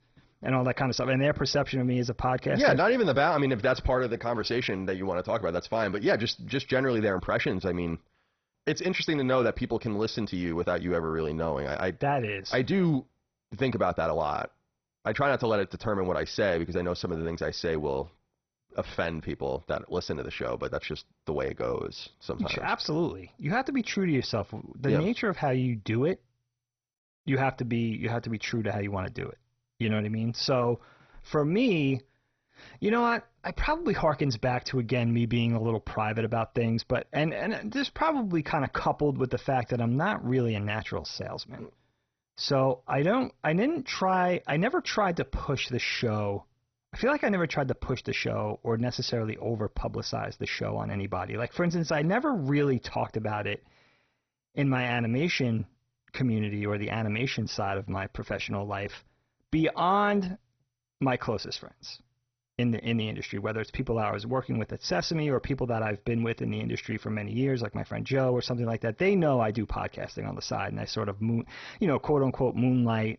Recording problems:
garbled, watery; badly; nothing above 6 kHz

